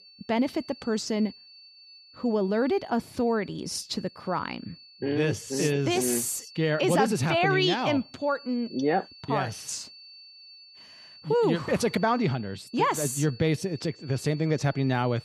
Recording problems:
high-pitched whine; faint; throughout; 4.5 kHz, 20 dB below the speech

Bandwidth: 14 kHz